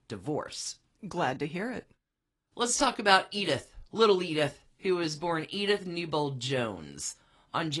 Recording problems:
garbled, watery; slightly
abrupt cut into speech; at the end

